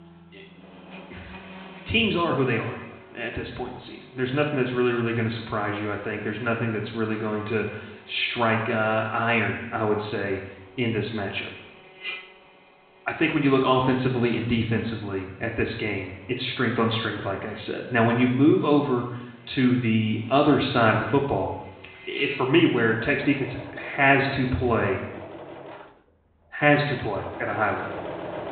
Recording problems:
high frequencies cut off; severe; nothing above 4 kHz
room echo; noticeable; dies away in 0.9 s
off-mic speech; somewhat distant
machinery noise; noticeable; throughout; 20 dB below the speech

